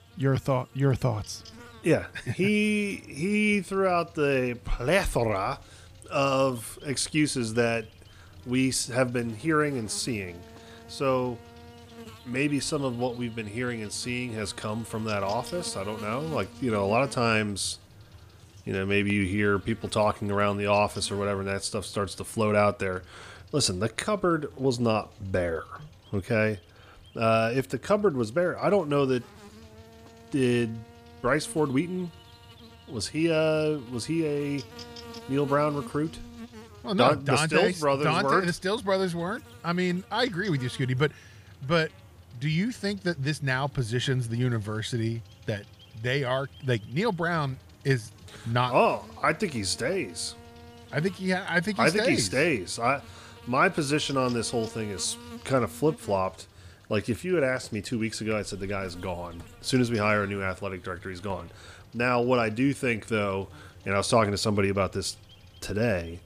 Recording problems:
electrical hum; faint; throughout; 50 Hz, 20 dB below the speech

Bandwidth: 15 kHz